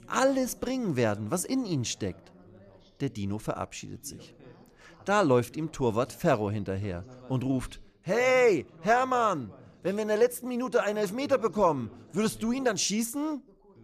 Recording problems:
background chatter; faint; throughout; 2 voices, 25 dB below the speech

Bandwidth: 14.5 kHz